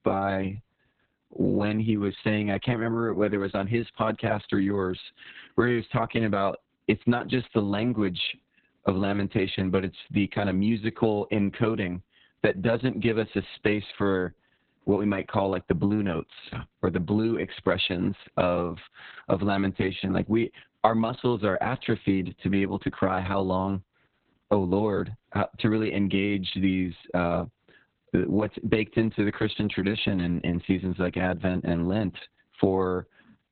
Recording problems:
garbled, watery; badly; nothing above 4 kHz

